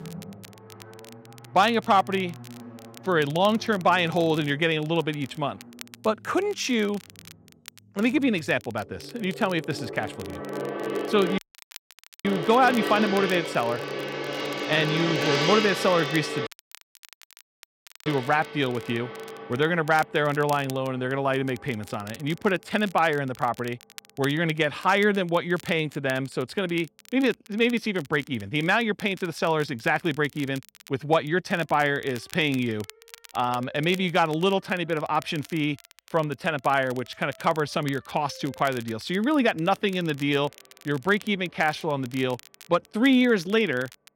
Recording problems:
background music; loud; throughout; 7 dB below the speech
crackle, like an old record; faint; 20 dB below the speech
audio cutting out; at 11 s for 1 s and at 16 s for 1.5 s

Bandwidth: 16 kHz